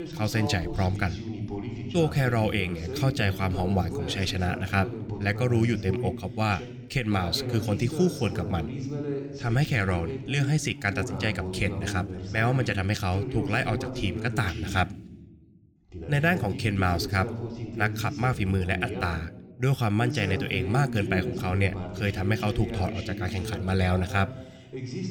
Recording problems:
voice in the background; loud; throughout; 7 dB below the speech

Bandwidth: 19 kHz